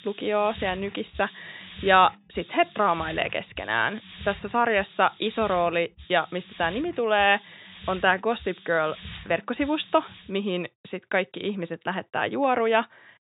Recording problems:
high frequencies cut off; severe; nothing above 4 kHz
hiss; noticeable; until 10 s; 20 dB below the speech

